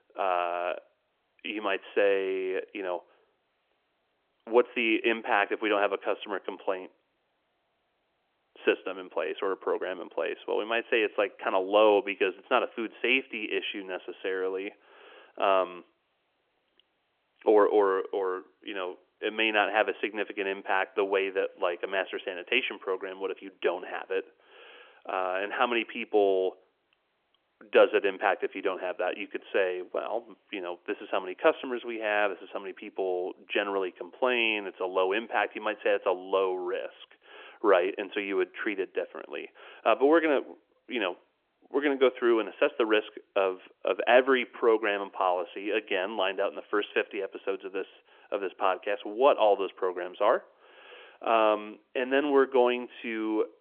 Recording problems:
phone-call audio; nothing above 3 kHz

